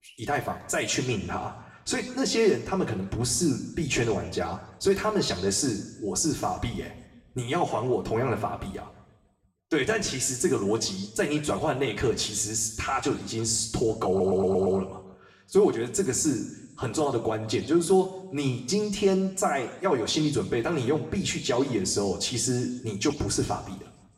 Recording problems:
room echo; slight; dies away in 0.8 s
off-mic speech; somewhat distant
audio stuttering; at 14 s

